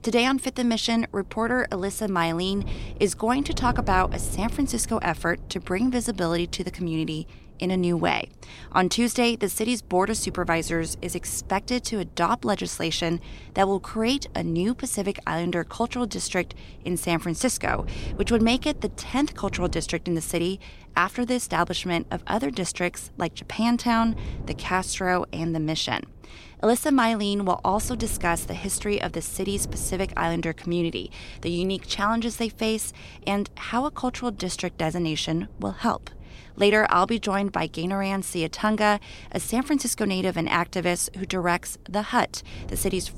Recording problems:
wind noise on the microphone; occasional gusts; 25 dB below the speech

